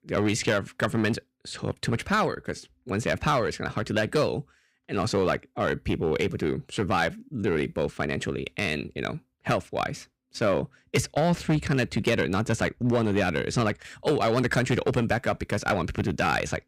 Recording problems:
distortion; slight; 4% of the sound clipped

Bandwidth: 15.5 kHz